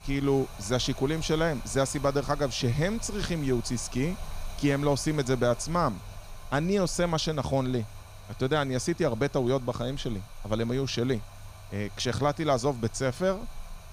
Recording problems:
rain or running water; noticeable; throughout; 15 dB below the speech

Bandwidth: 15.5 kHz